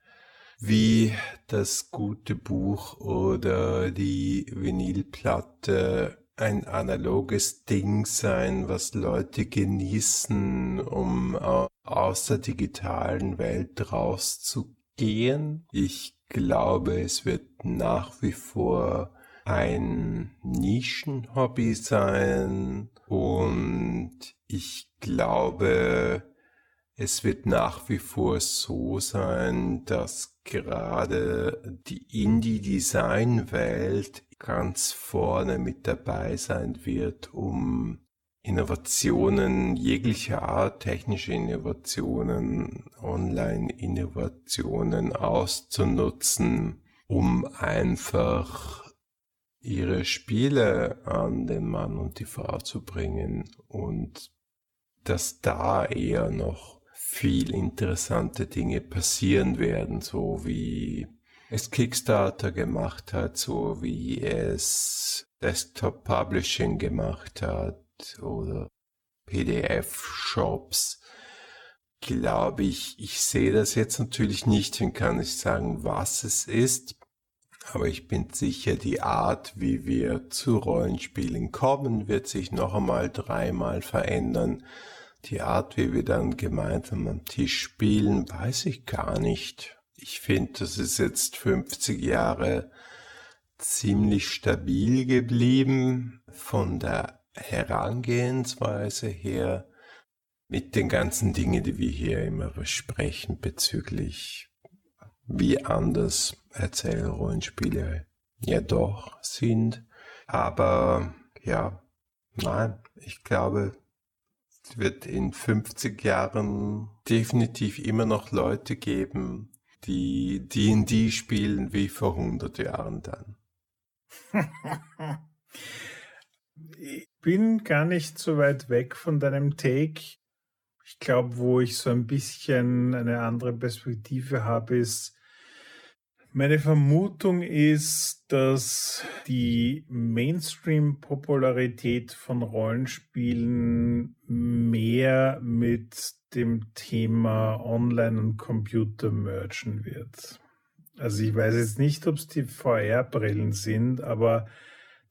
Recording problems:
wrong speed, natural pitch; too slow; 0.6 times normal speed

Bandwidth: 18 kHz